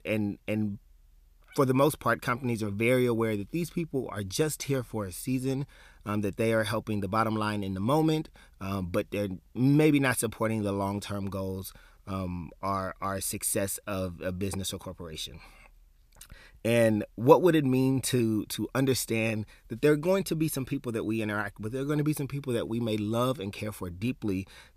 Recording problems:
none

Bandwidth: 14.5 kHz